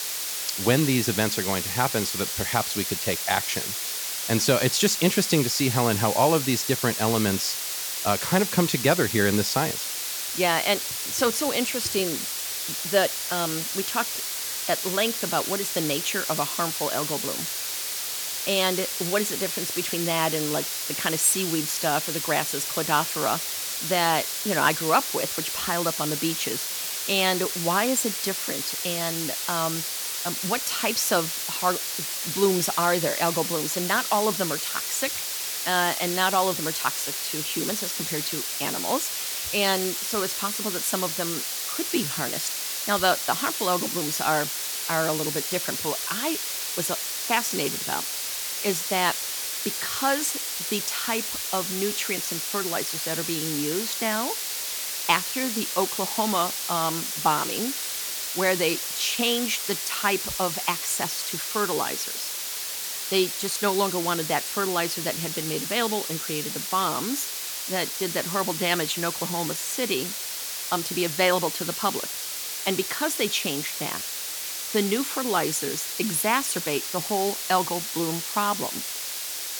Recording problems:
hiss; loud; throughout; 1 dB below the speech

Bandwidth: 19 kHz